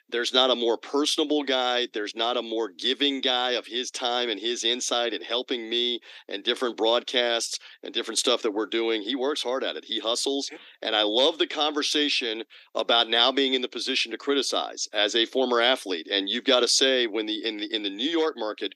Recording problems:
thin; somewhat; fading below 300 Hz

